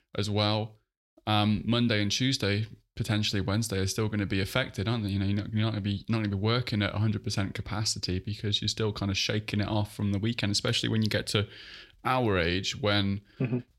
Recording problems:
none

